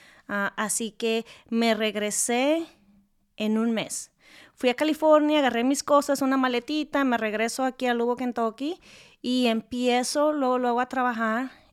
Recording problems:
none

